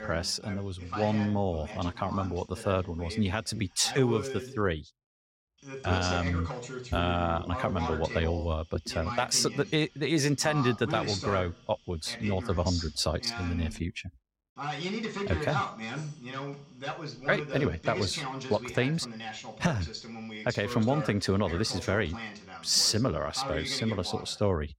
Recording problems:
voice in the background; loud; throughout; 8 dB below the speech

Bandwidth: 16 kHz